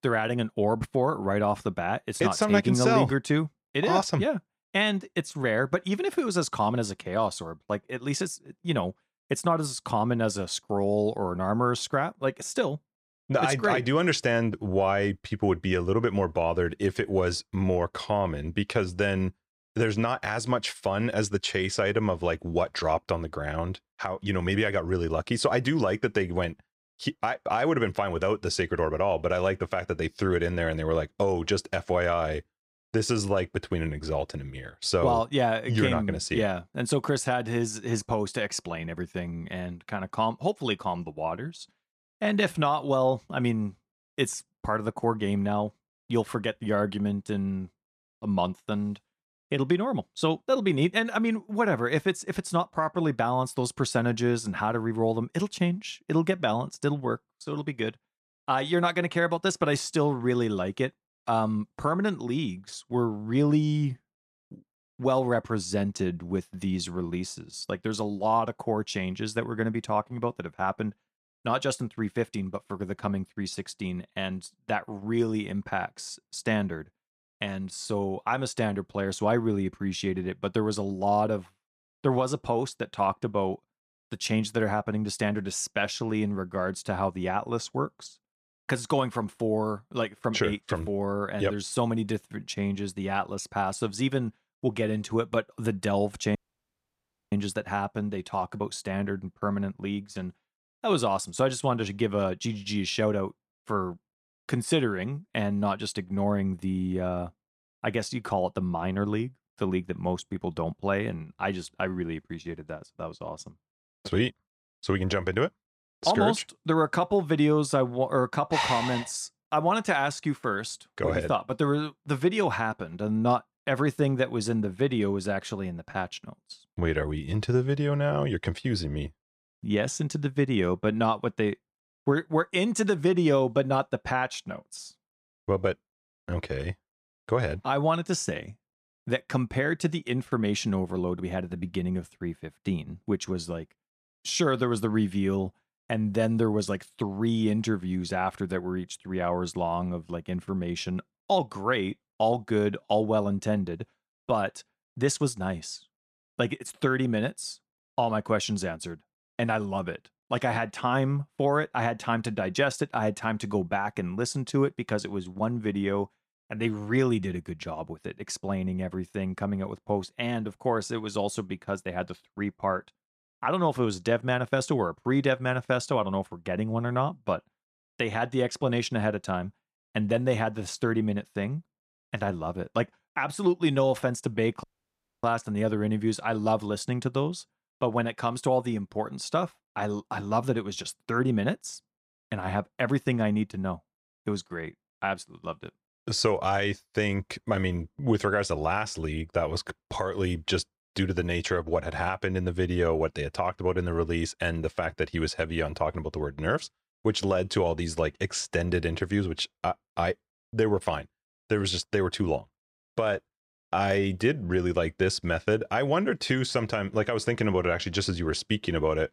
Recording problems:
audio cutting out; at 1:36 for 1 s and at 3:05 for 0.5 s

